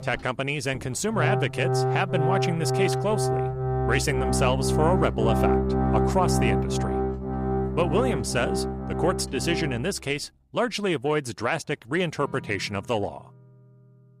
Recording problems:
background music; very loud; throughout; 1 dB above the speech

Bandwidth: 14.5 kHz